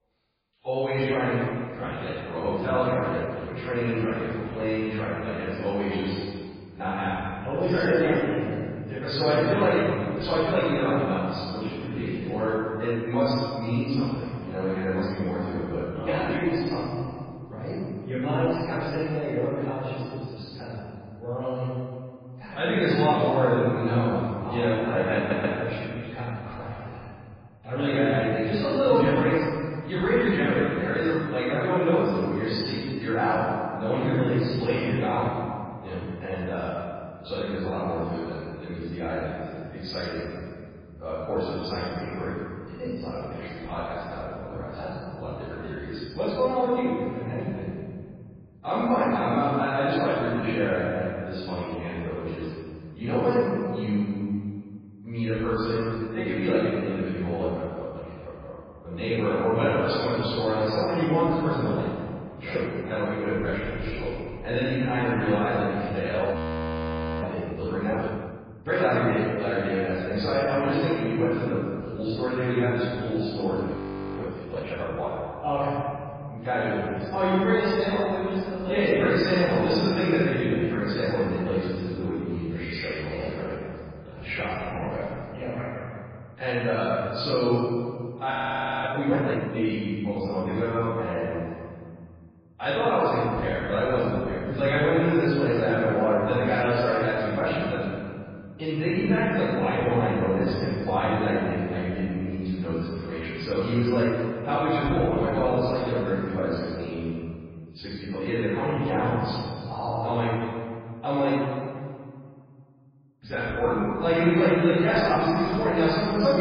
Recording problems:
room echo; strong; dies away in 2.1 s
off-mic speech; far
garbled, watery; badly
audio stuttering; at 25 s
audio freezing; at 1:06 for 1 s, at 1:14 and at 1:28 for 0.5 s
abrupt cut into speech; at the end

